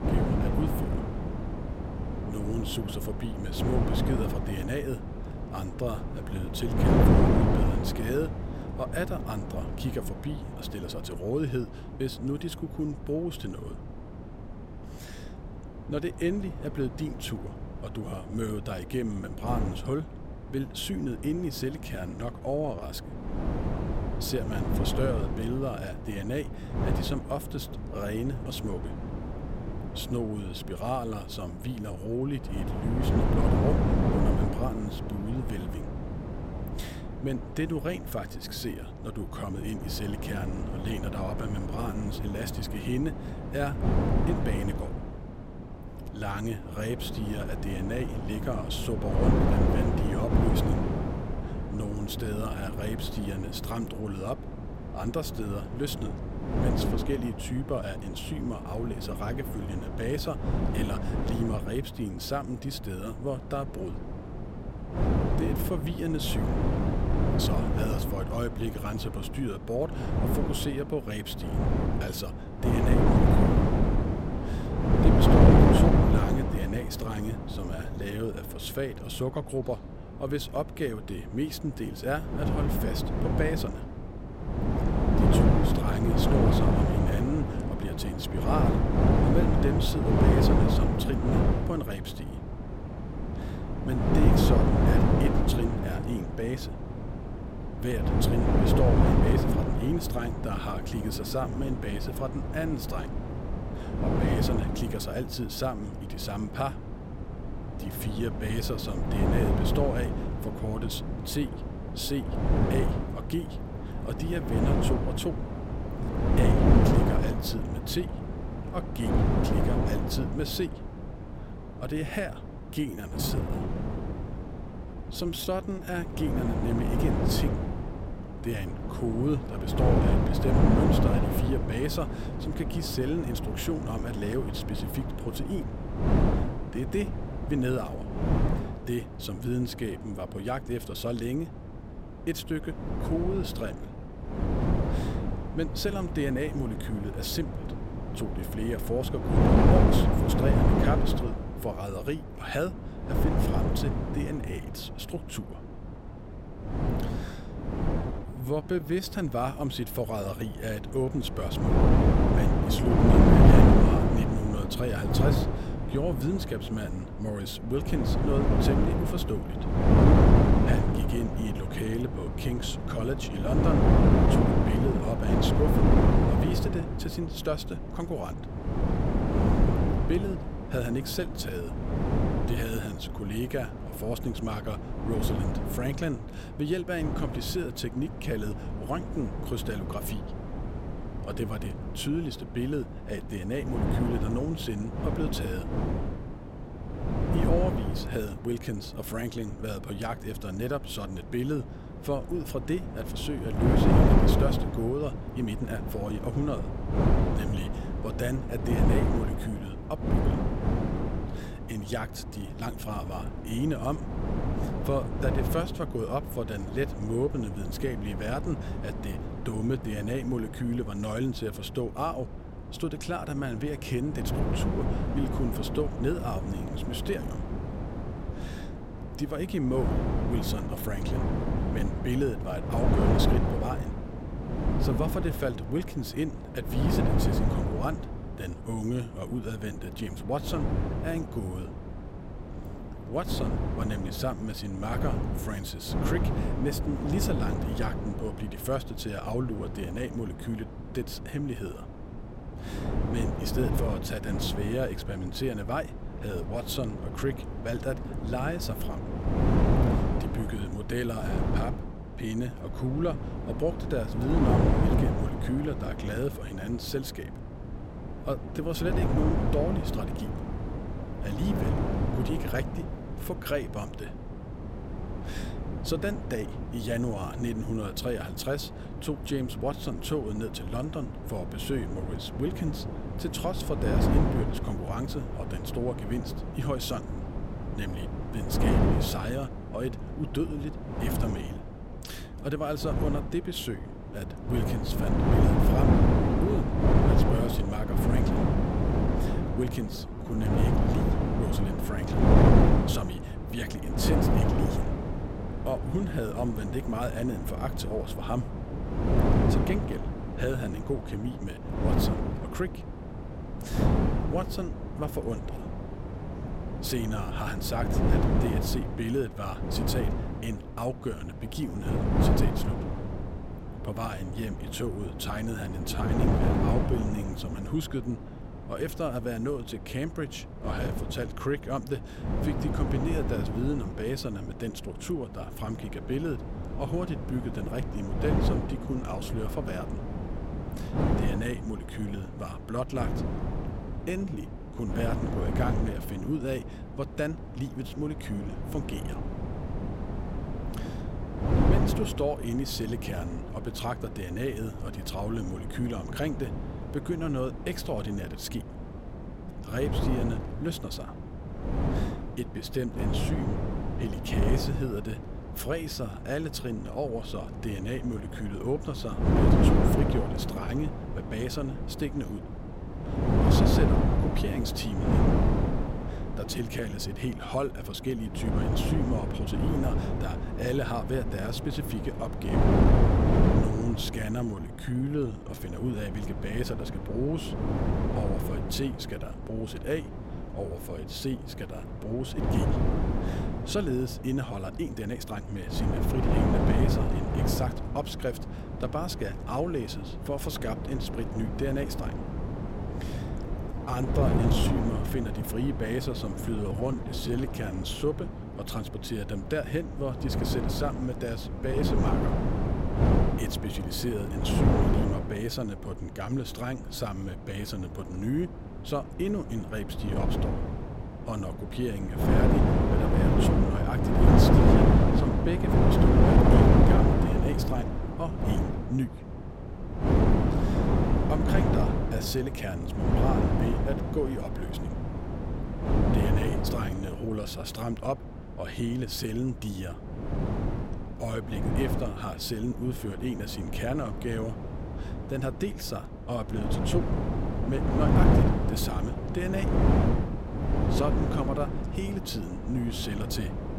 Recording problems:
wind noise on the microphone; heavy; 1 dB above the speech
uneven, jittery; strongly; from 12 s to 6:52

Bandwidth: 16 kHz